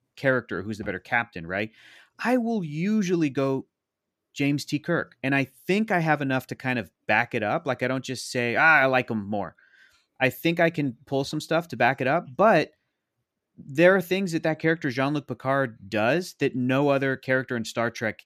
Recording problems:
none

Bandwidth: 14.5 kHz